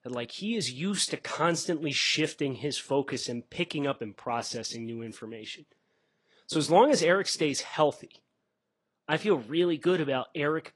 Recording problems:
garbled, watery; slightly; nothing above 10 kHz

